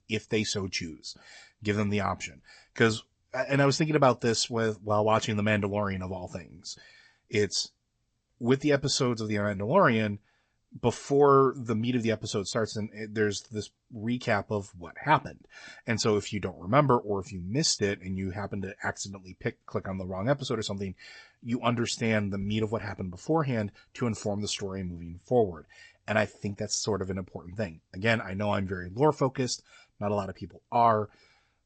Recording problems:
garbled, watery; slightly; nothing above 8 kHz

